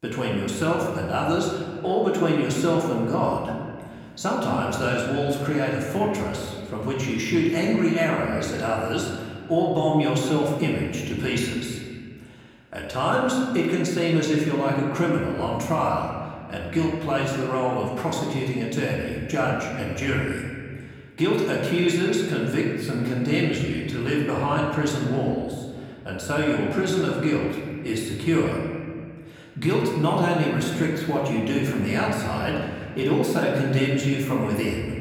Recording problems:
off-mic speech; far
room echo; noticeable; dies away in 1.9 s

